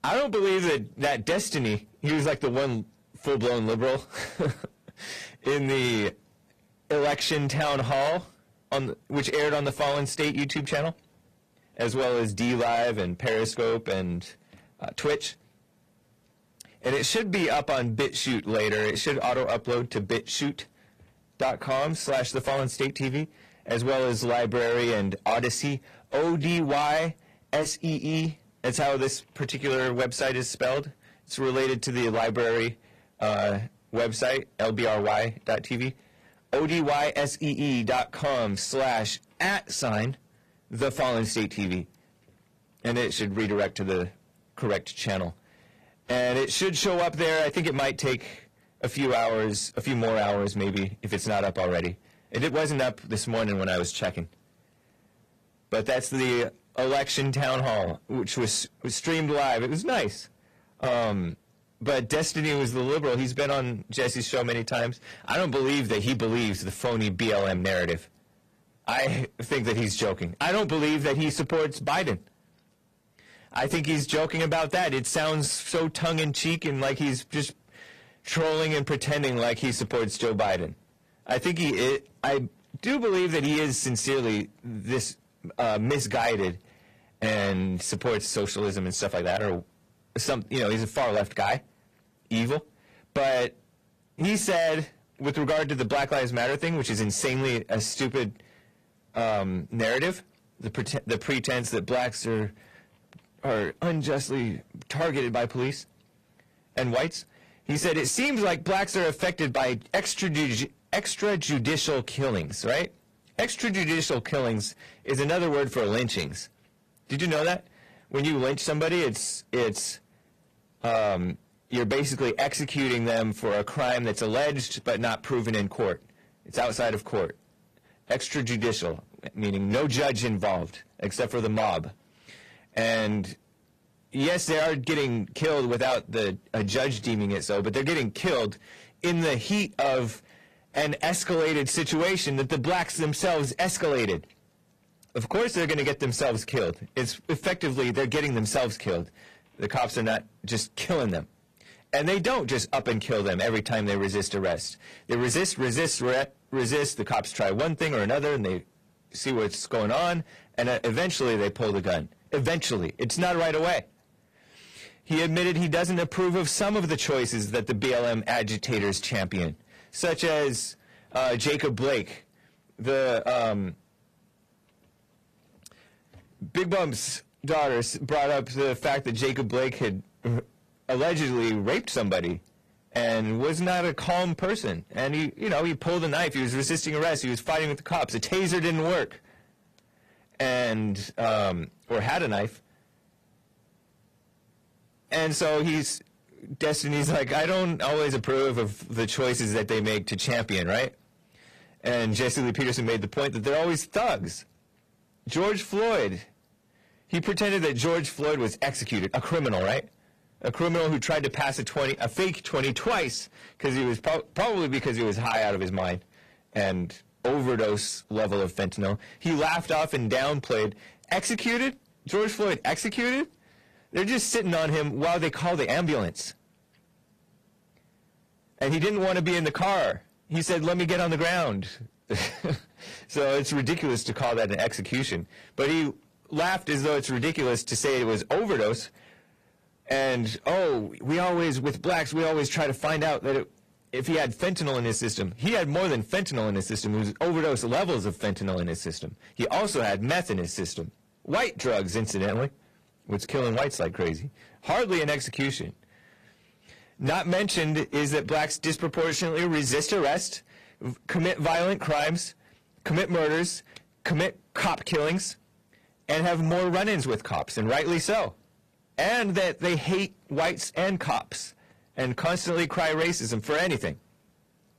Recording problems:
distortion; heavy; 7 dB below the speech
garbled, watery; slightly; nothing above 14.5 kHz

